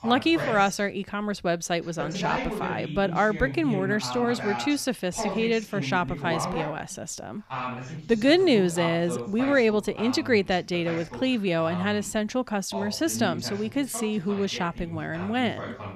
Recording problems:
voice in the background; loud; throughout; 9 dB below the speech

